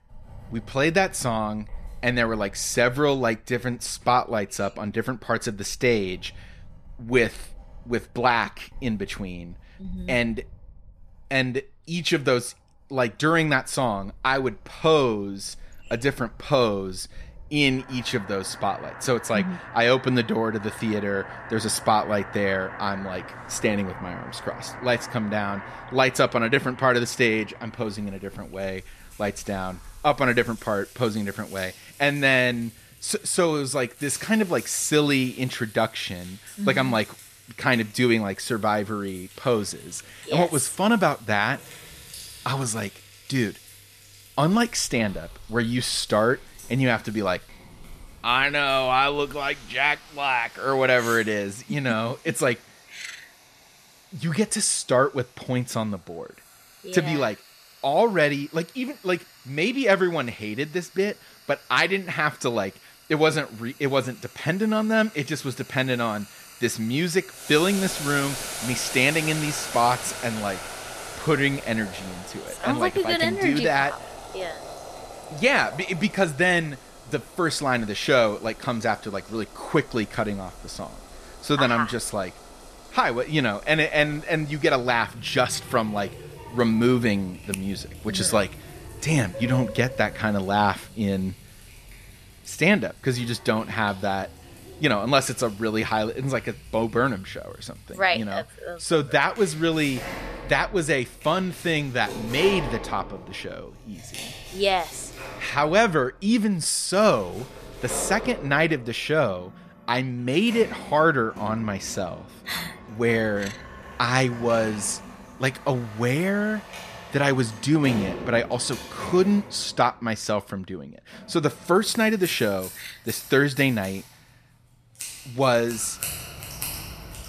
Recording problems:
household noises; noticeable; throughout; 15 dB below the speech

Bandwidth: 14.5 kHz